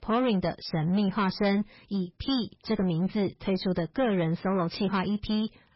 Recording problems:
garbled, watery; badly; nothing above 5.5 kHz
distortion; slight; 10% of the sound clipped

